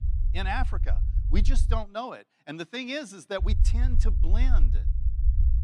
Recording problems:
low rumble; noticeable; until 2 s and from 3.5 s on; 15 dB below the speech

